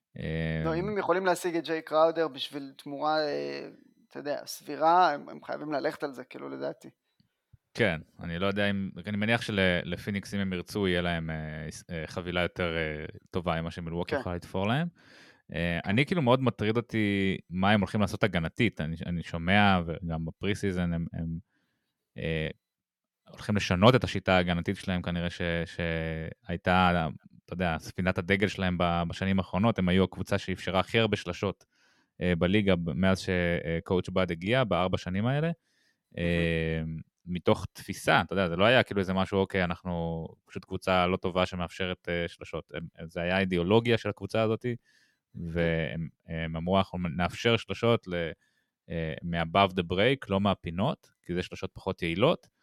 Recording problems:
none

